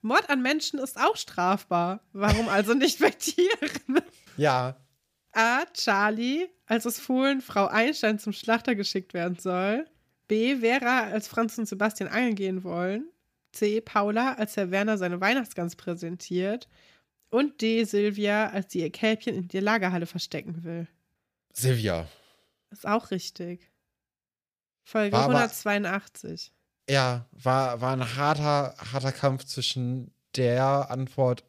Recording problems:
none

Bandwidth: 15 kHz